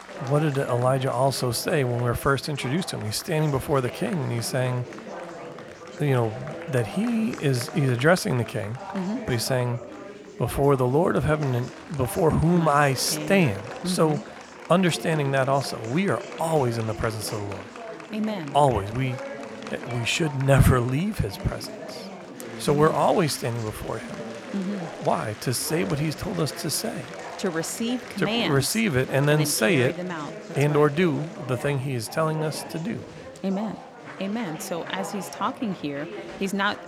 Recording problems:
chatter from many people; noticeable; throughout; 15 dB below the speech

